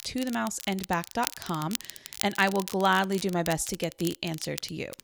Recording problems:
crackle, like an old record; noticeable; 10 dB below the speech

